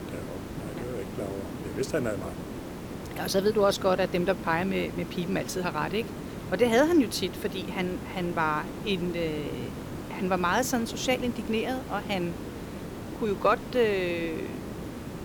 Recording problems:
hiss; loud; throughout; 9 dB below the speech

